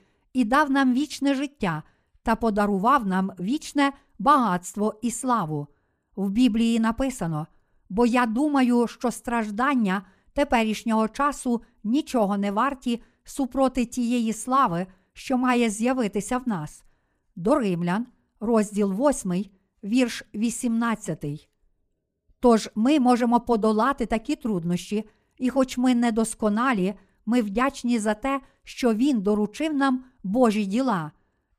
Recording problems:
none

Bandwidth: 15 kHz